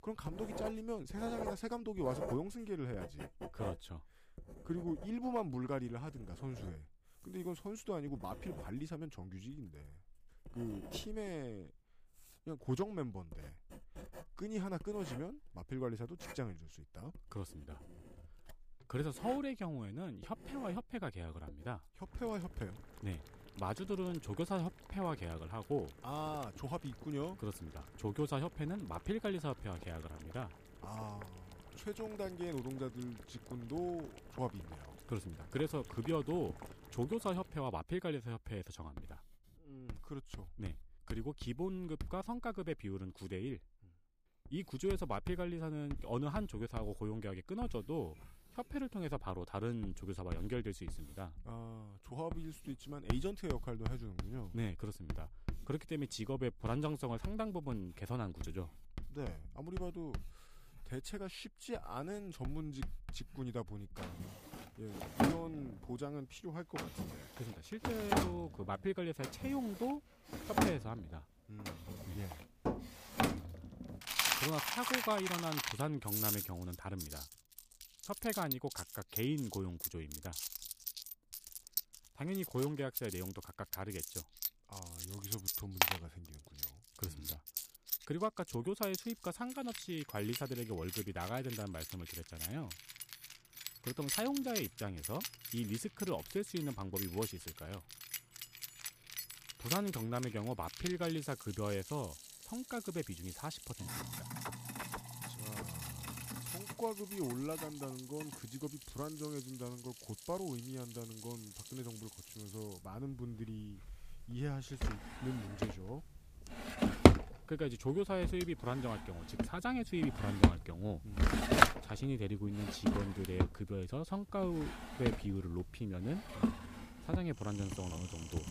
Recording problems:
household noises; very loud; throughout; 1 dB above the speech

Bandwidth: 15 kHz